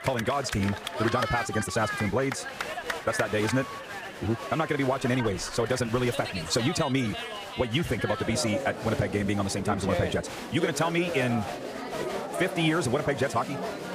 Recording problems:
wrong speed, natural pitch; too fast; 1.6 times normal speed
crowd noise; loud; throughout; 6 dB below the speech
voice in the background; faint; throughout; 30 dB below the speech

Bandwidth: 15 kHz